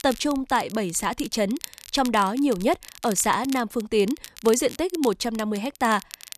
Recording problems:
crackle, like an old record; noticeable; 15 dB below the speech

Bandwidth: 14 kHz